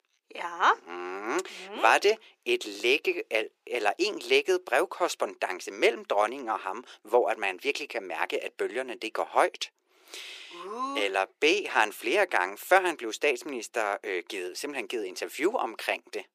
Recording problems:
thin; very; fading below 350 Hz

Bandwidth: 15 kHz